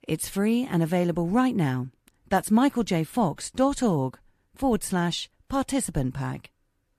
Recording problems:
none

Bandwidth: 14.5 kHz